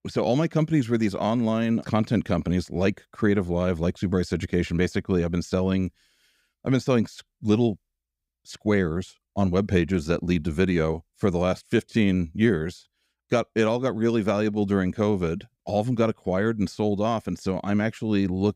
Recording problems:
none

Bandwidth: 15.5 kHz